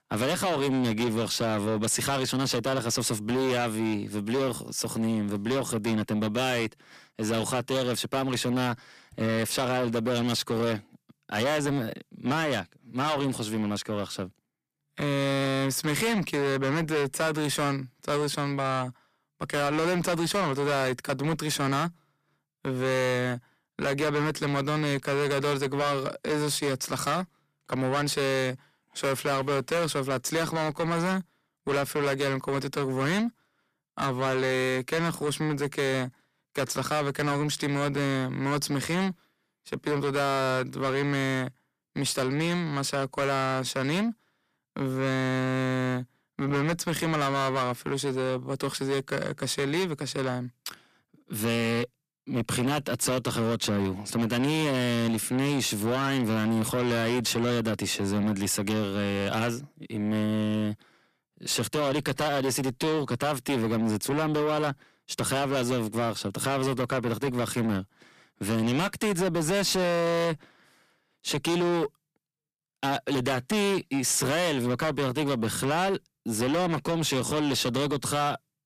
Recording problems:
distortion; heavy; 7 dB below the speech

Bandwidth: 14.5 kHz